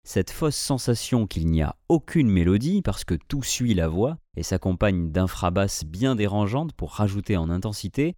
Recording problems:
none

